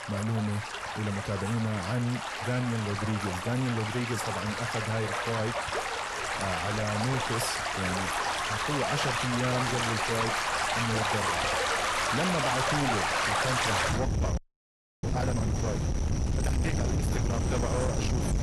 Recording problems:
distortion; heavy; 8 dB below the speech
garbled, watery; slightly; nothing above 12 kHz
rain or running water; very loud; throughout; 2 dB above the speech
audio freezing; at 14 s for 0.5 s

